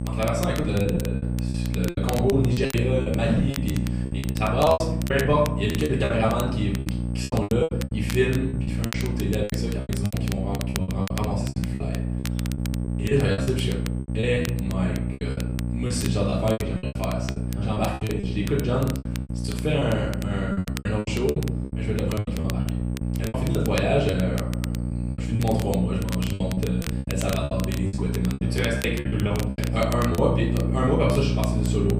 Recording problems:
off-mic speech; far
room echo; slight; dies away in 0.7 s
electrical hum; loud; throughout; 60 Hz, 9 dB below the speech
crackle, like an old record; noticeable; 15 dB below the speech
high-pitched whine; faint; throughout; 8.5 kHz, 30 dB below the speech
choppy; very; 17% of the speech affected

